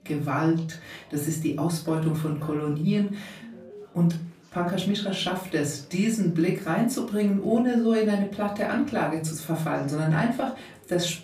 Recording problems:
off-mic speech; far
room echo; slight; dies away in 0.3 s
chatter from many people; faint; throughout; 30 dB below the speech
alarm; faint; at 3.5 s; peak 15 dB below the speech

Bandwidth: 15 kHz